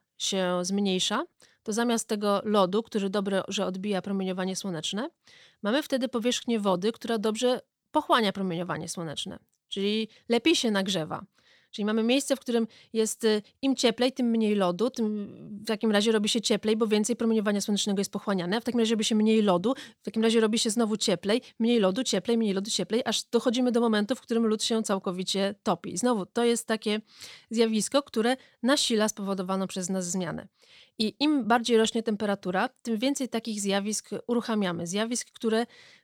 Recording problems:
none

